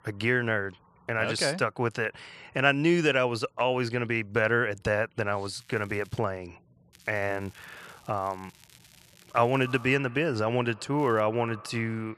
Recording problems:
echo of what is said; faint; from 9.5 s on; 110 ms later, 20 dB below the speech
crackling; faint; at 5.5 s, from 7 to 10 s and at 11 s; 30 dB below the speech

